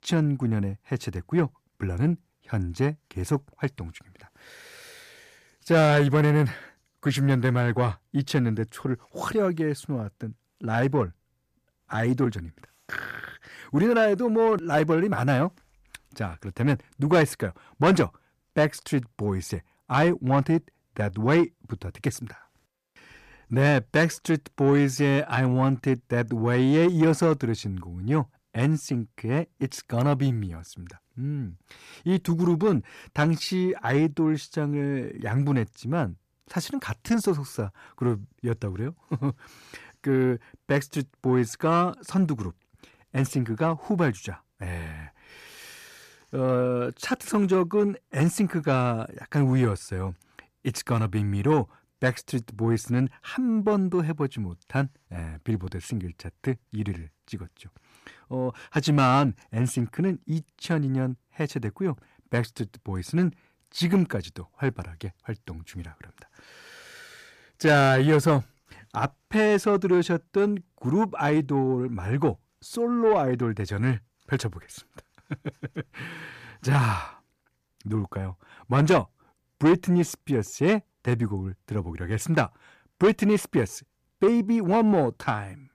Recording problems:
distortion; slight; 10 dB below the speech

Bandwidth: 14.5 kHz